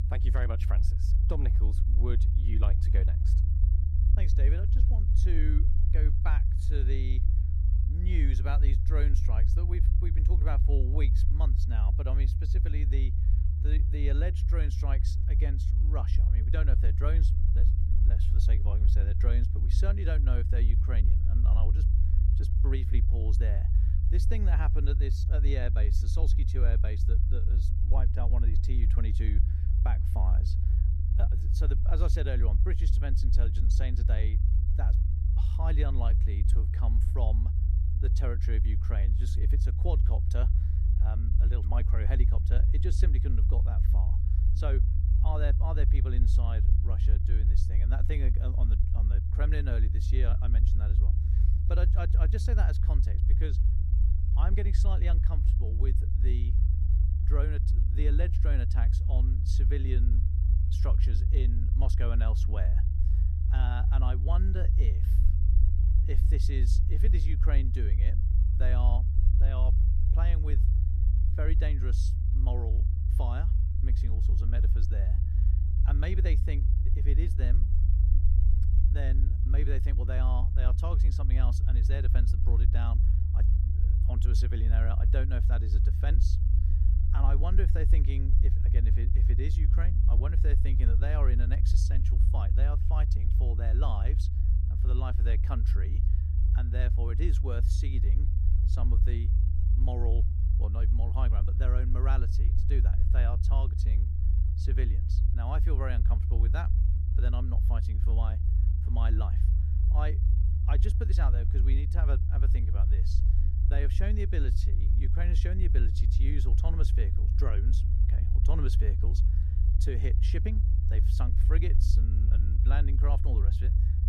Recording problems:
low rumble; loud; throughout; 3 dB below the speech

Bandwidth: 15 kHz